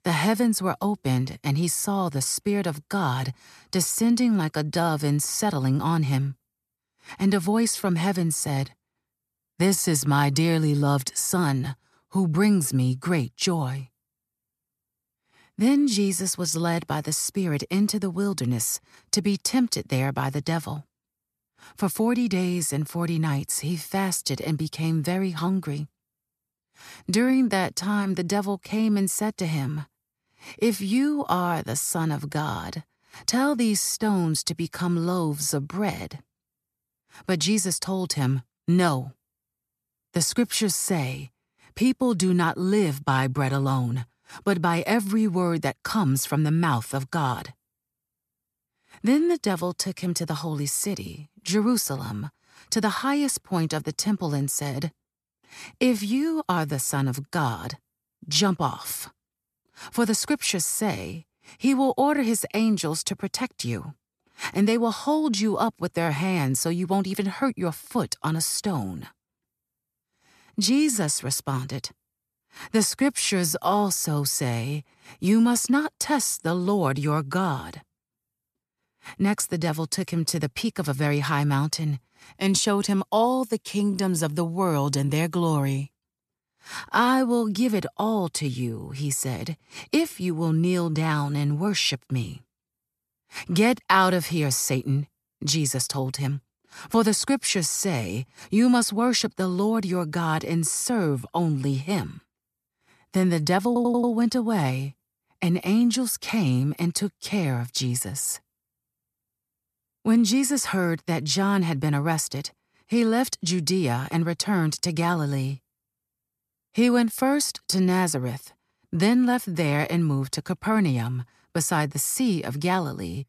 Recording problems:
audio stuttering; at 1:44

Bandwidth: 14 kHz